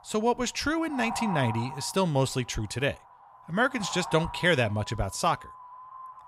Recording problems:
wind noise on the microphone; heavy; 9 dB below the speech

